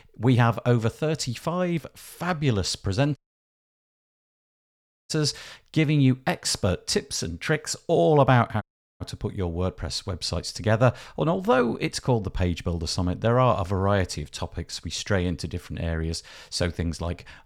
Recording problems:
audio cutting out; at 3 s for 2 s and at 8.5 s

